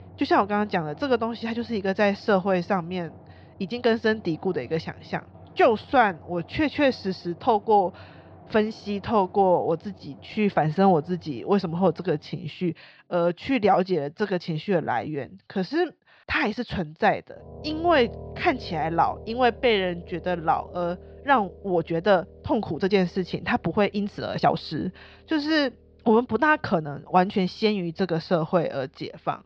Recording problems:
muffled; very slightly; fading above 4.5 kHz
background music; faint; throughout; 20 dB below the speech
uneven, jittery; strongly; from 3.5 to 28 s

